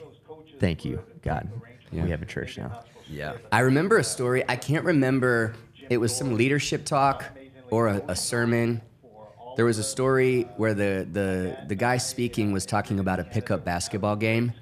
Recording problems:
voice in the background; faint; throughout; 20 dB below the speech

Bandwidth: 14 kHz